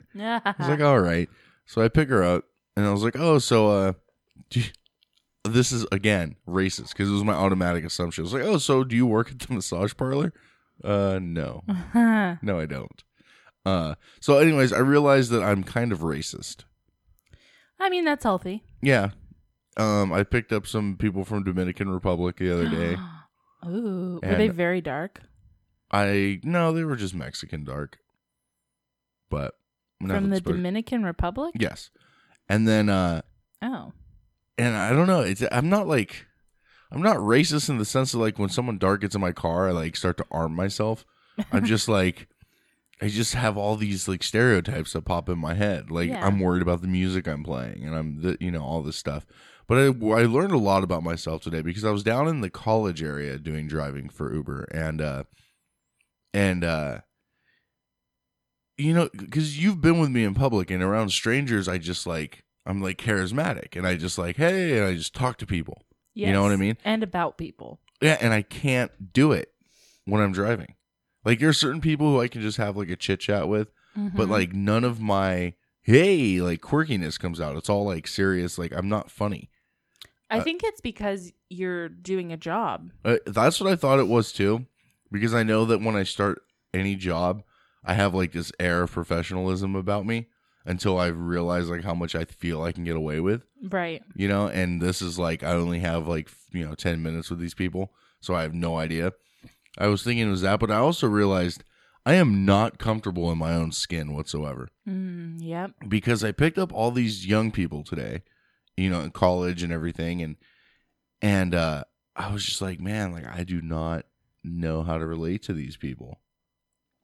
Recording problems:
none

